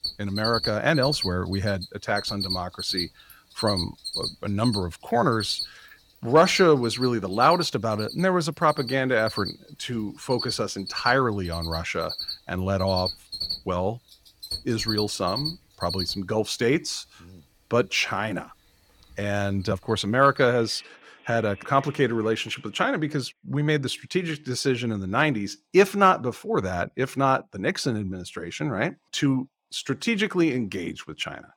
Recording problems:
animal sounds; loud; until 23 s; 7 dB below the speech

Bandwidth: 18 kHz